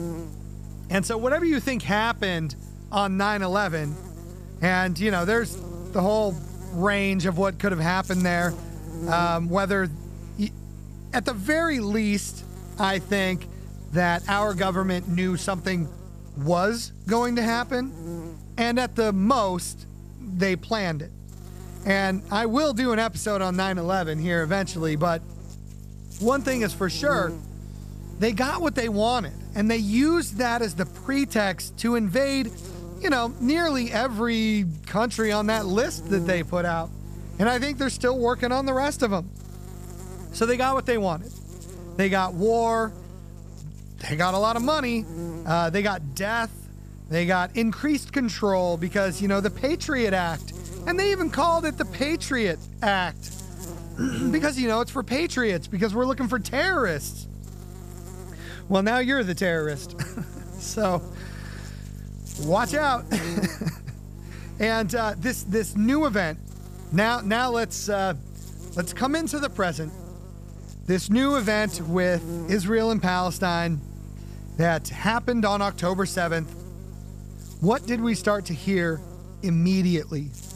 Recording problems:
electrical hum; faint; throughout; 50 Hz, 20 dB below the speech

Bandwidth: 14.5 kHz